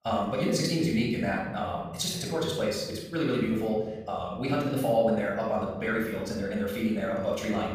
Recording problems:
wrong speed, natural pitch; too fast; 1.6 times normal speed
room echo; noticeable; dies away in 1.1 s
off-mic speech; somewhat distant

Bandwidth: 15 kHz